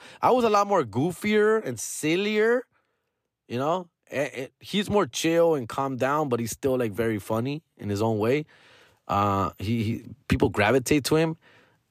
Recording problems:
none

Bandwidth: 14.5 kHz